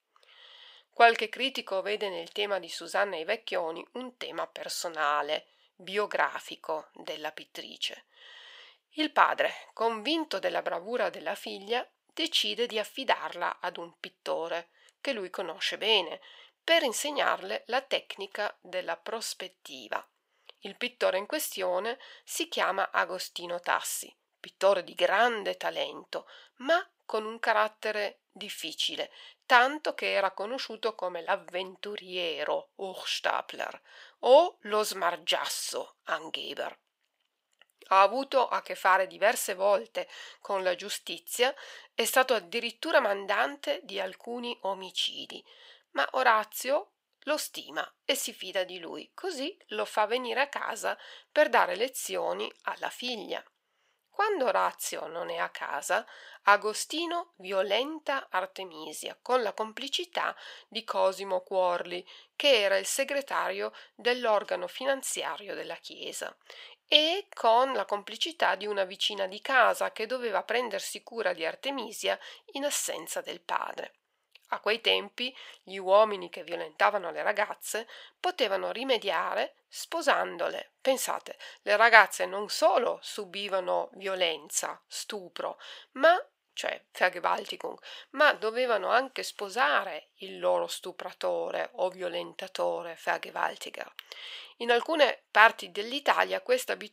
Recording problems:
thin; very; fading below 650 Hz

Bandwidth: 15.5 kHz